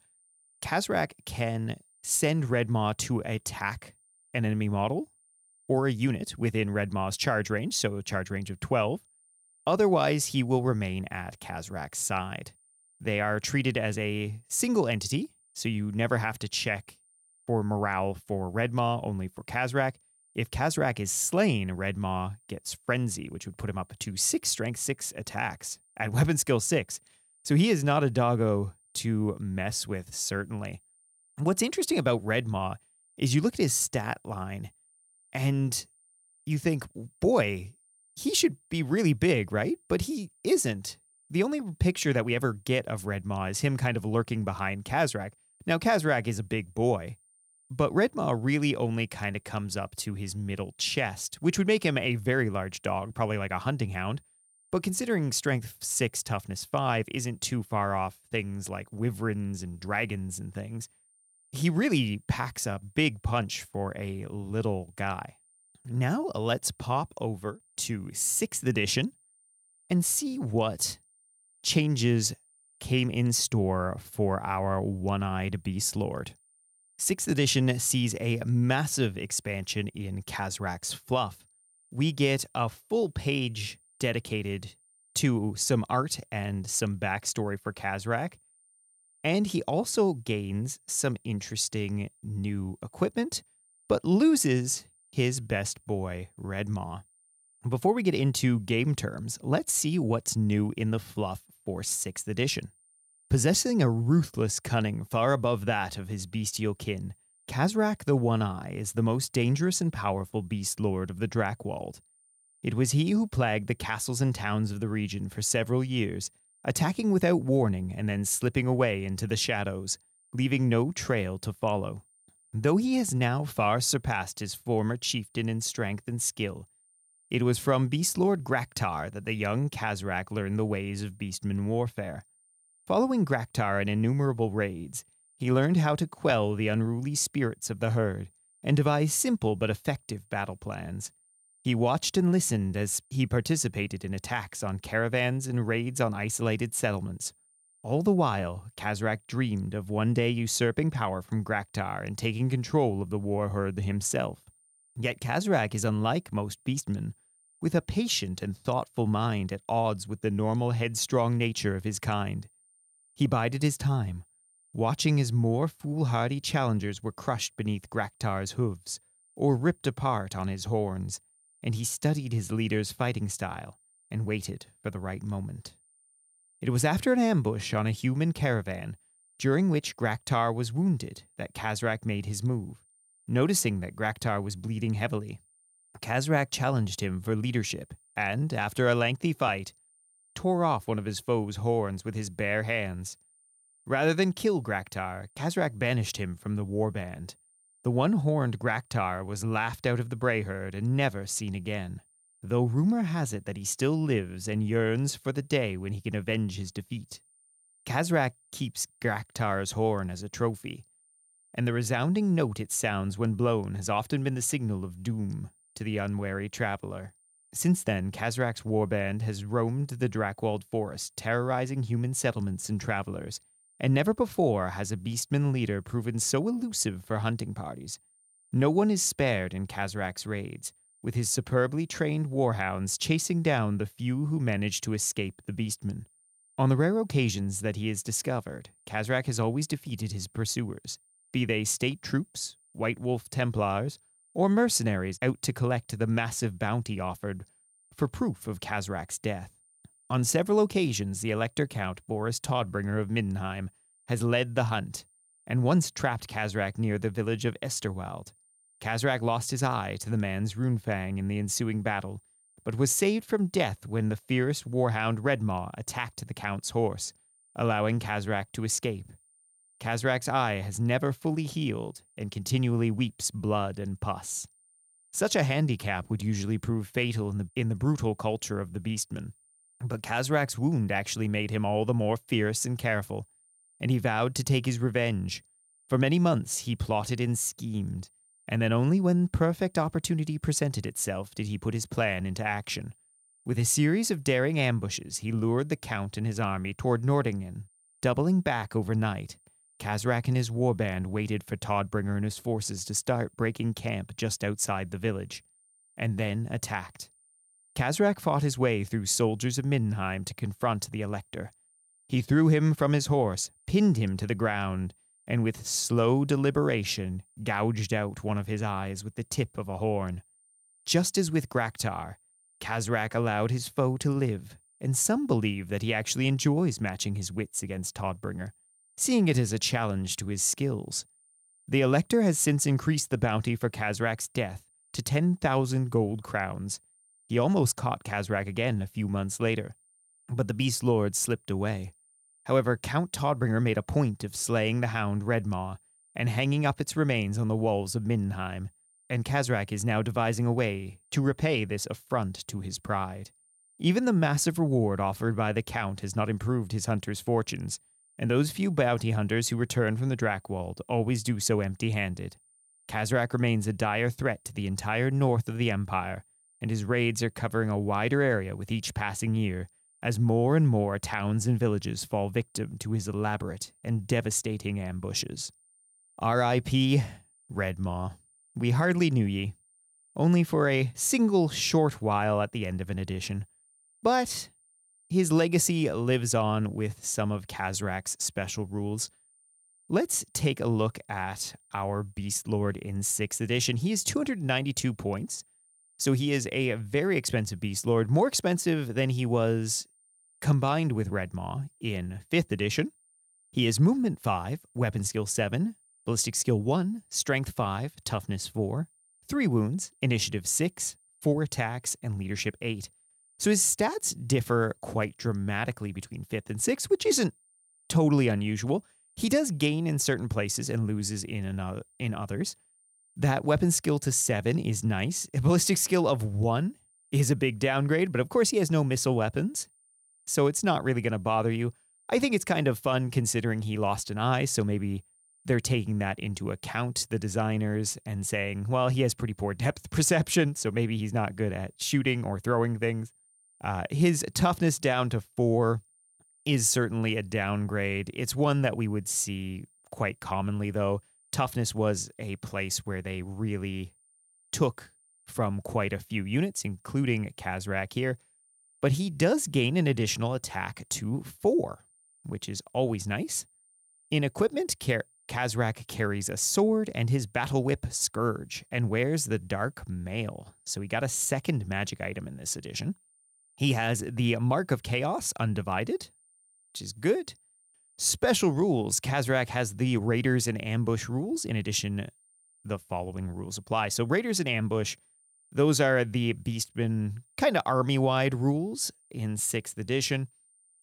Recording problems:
high-pitched whine; faint; throughout; 9 kHz, 35 dB below the speech

